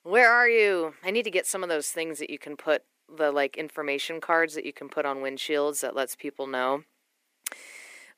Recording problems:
thin; somewhat; fading below 350 Hz

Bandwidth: 15 kHz